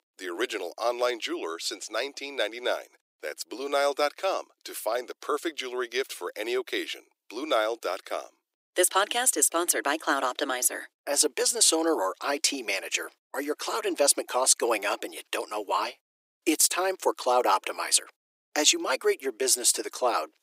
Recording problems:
thin; very; fading below 300 Hz

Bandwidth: 15.5 kHz